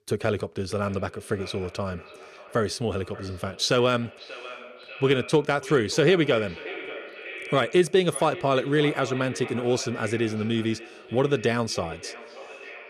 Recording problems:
echo of what is said; noticeable; throughout; 590 ms later, 15 dB below the speech

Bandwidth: 14.5 kHz